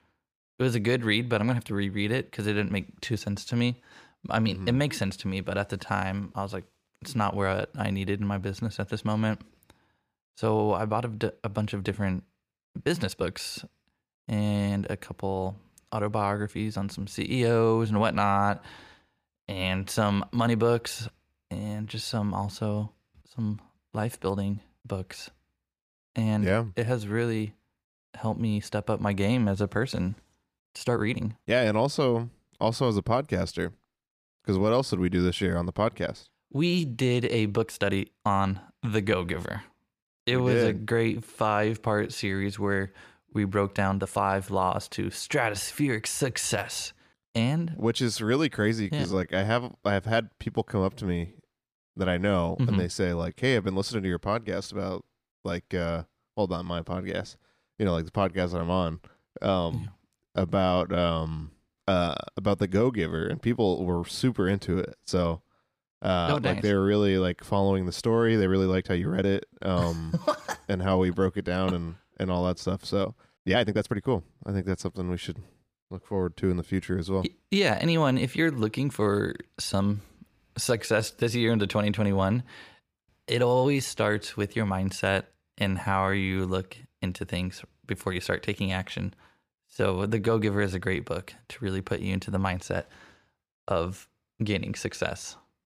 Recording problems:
uneven, jittery; strongly; from 5.5 s to 1:30

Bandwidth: 15 kHz